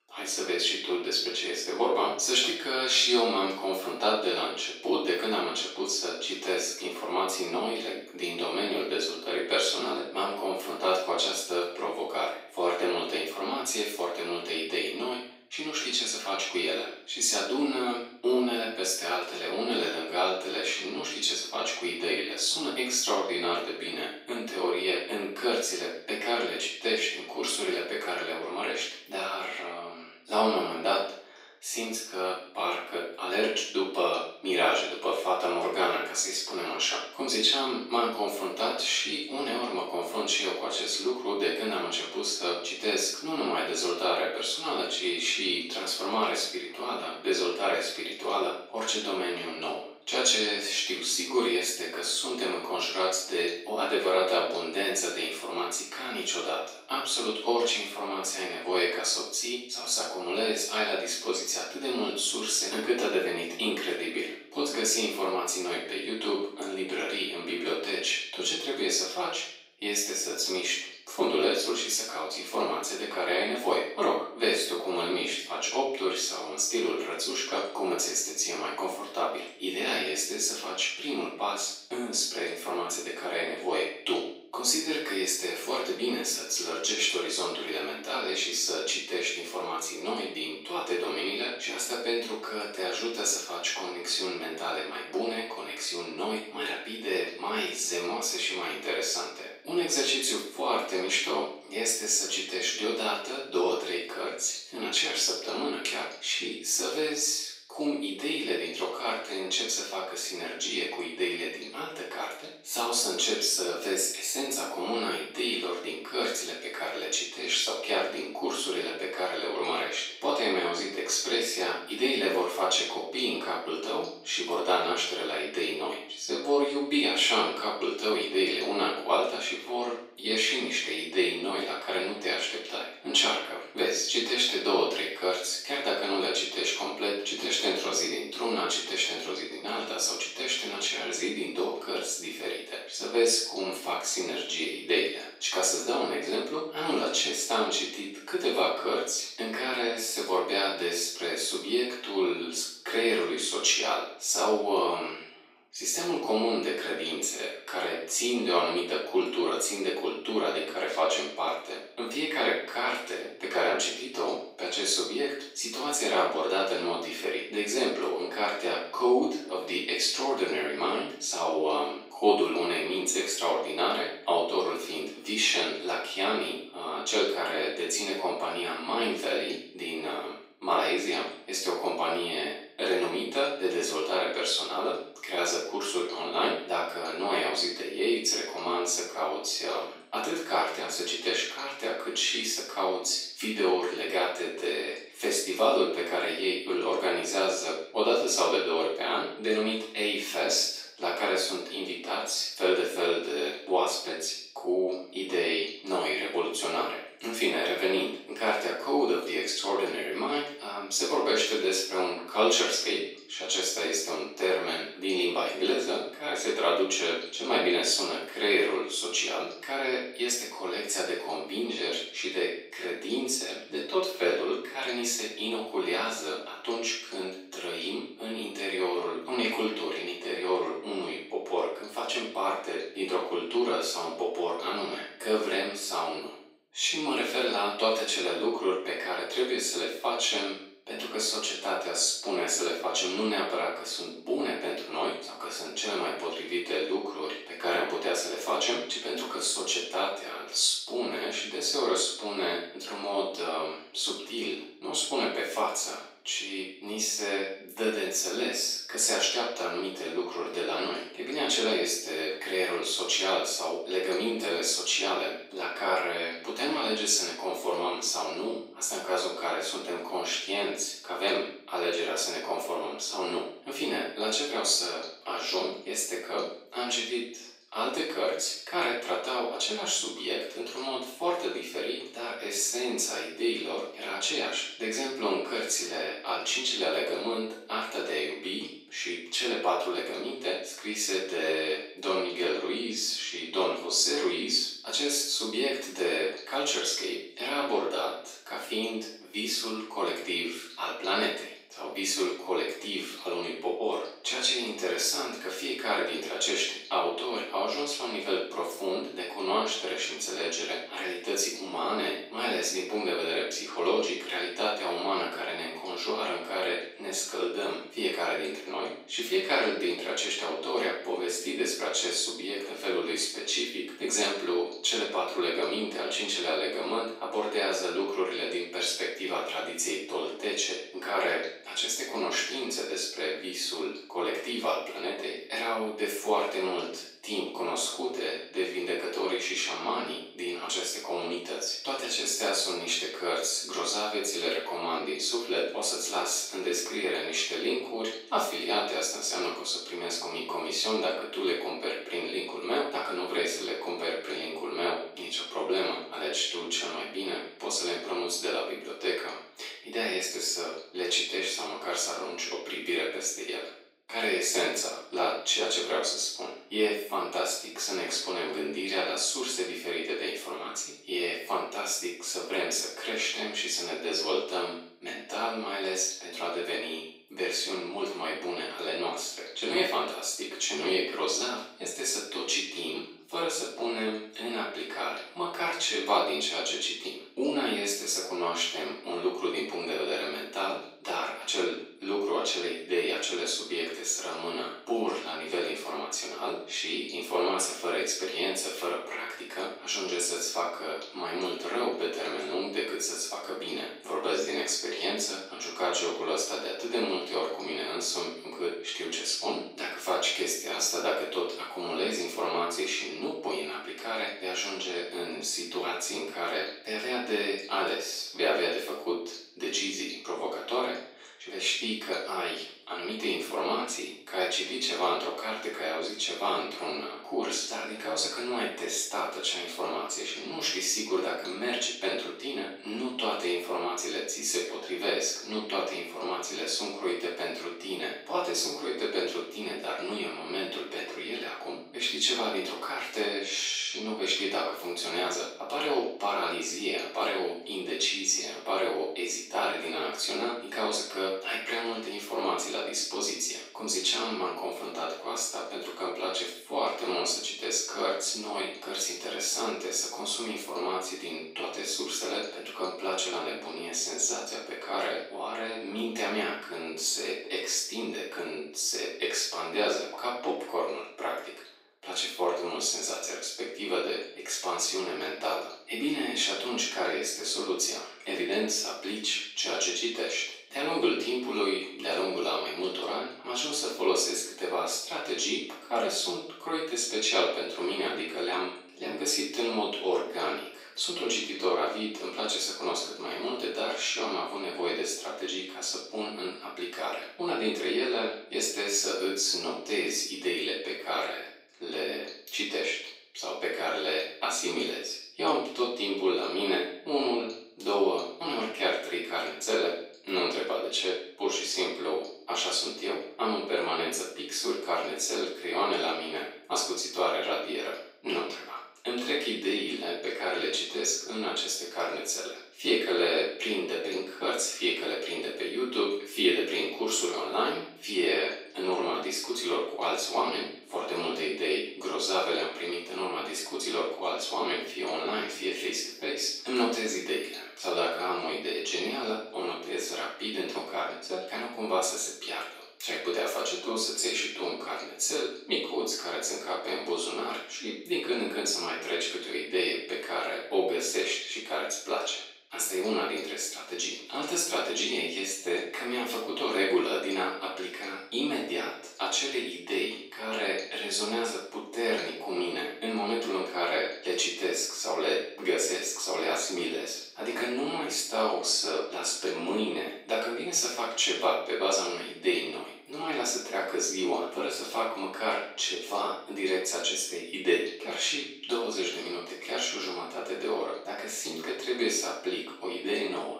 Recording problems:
off-mic speech; far
thin; very; fading below 350 Hz
room echo; noticeable; dies away in 0.5 s

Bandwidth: 15.5 kHz